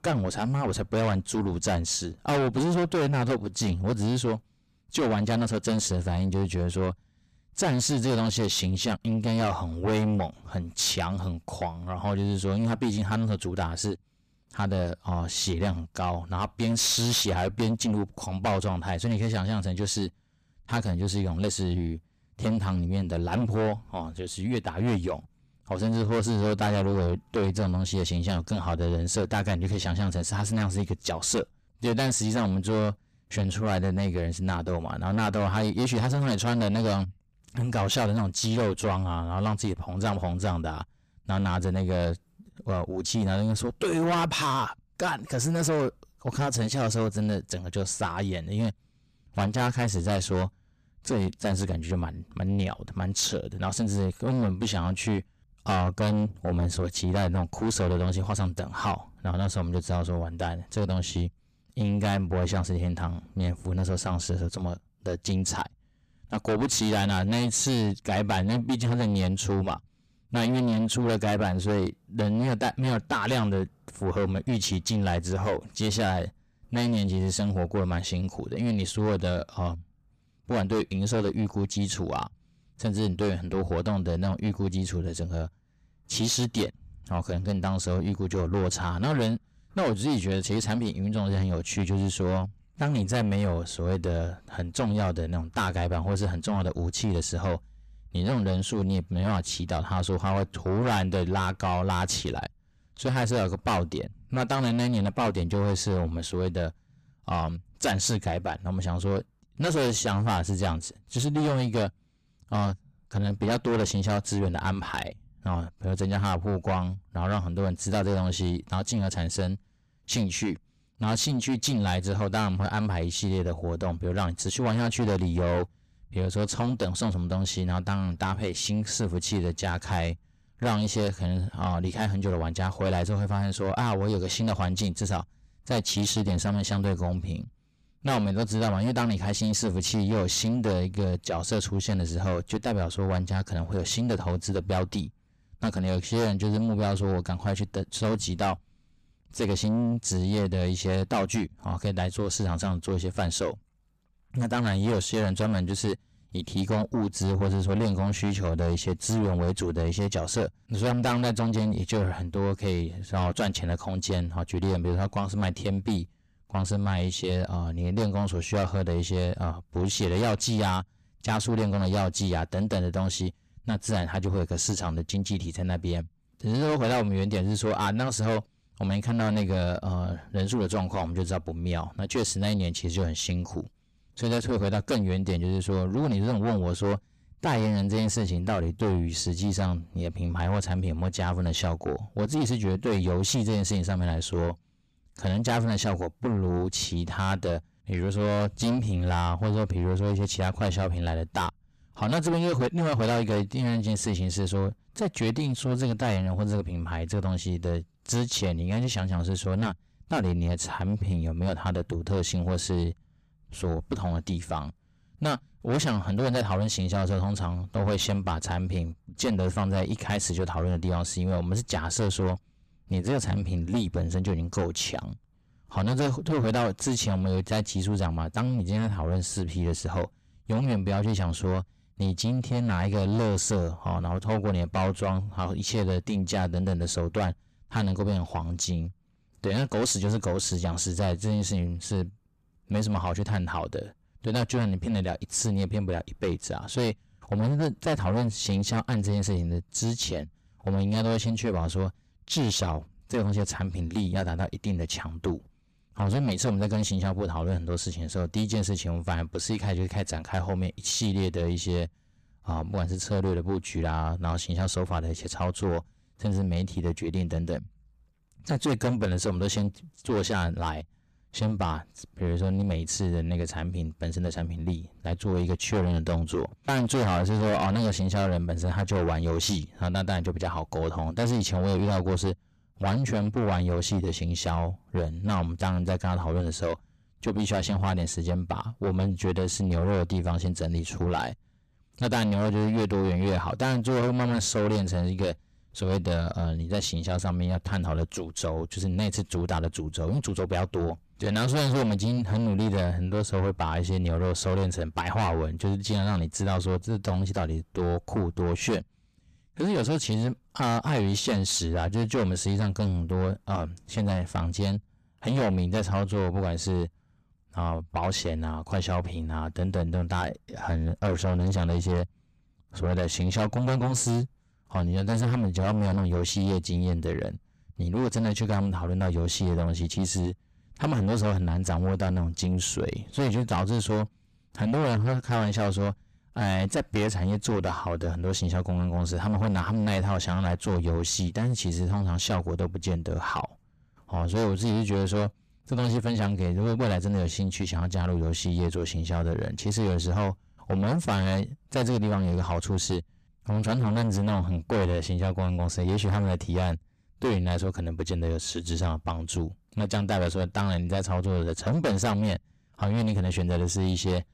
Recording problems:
distortion; heavy; 7 dB below the speech

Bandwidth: 14.5 kHz